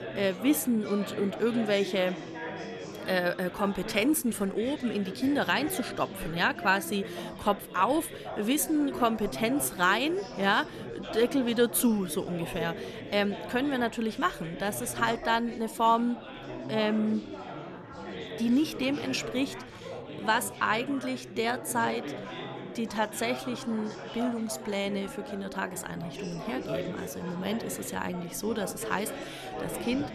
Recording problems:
chatter from many people; loud; throughout; 10 dB below the speech

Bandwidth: 14 kHz